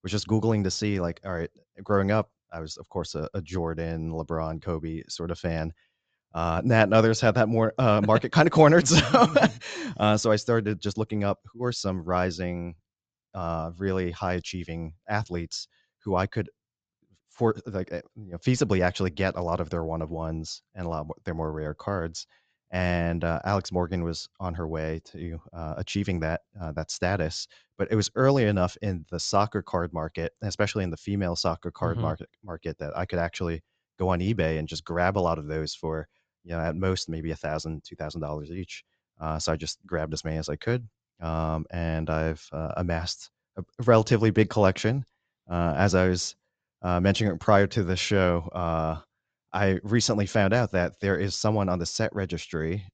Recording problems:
high frequencies cut off; noticeable; nothing above 8 kHz

